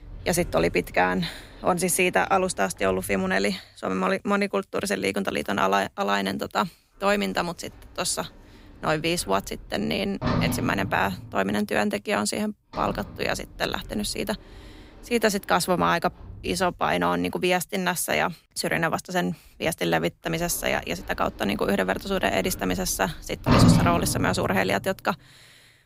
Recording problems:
household noises; loud; throughout; 3 dB below the speech

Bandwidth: 15.5 kHz